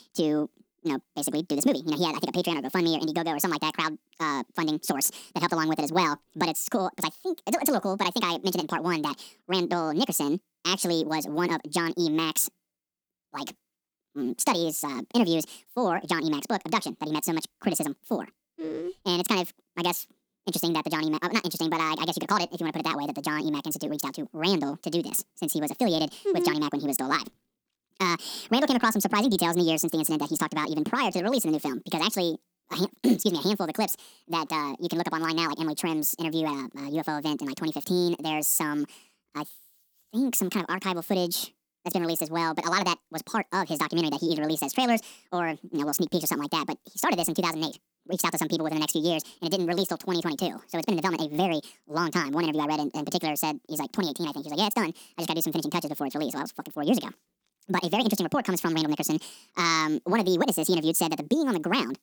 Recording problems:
wrong speed and pitch; too fast and too high; 1.7 times normal speed

